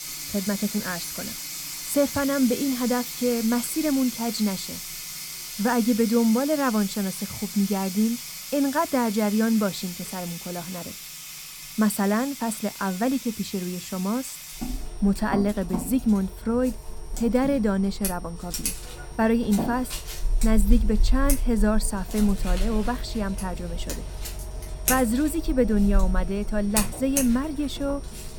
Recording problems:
household noises; loud; throughout; 7 dB below the speech
high-pitched whine; faint; throughout; 9 kHz, 25 dB below the speech

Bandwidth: 18 kHz